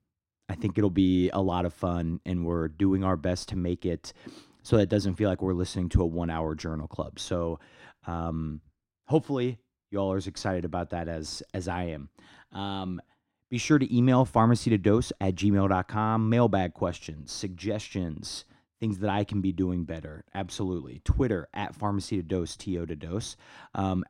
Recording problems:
muffled; slightly; fading above 3 kHz

